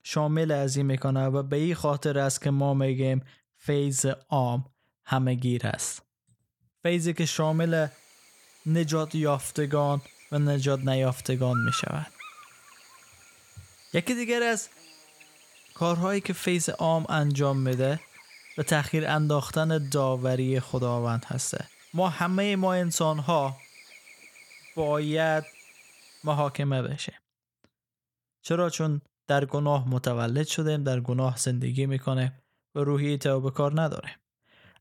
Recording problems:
electrical hum; noticeable; from 7.5 to 27 s; 50 Hz, 15 dB below the speech

